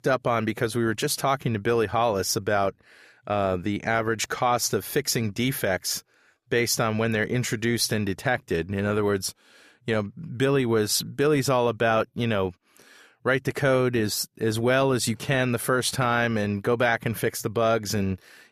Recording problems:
none

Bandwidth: 14.5 kHz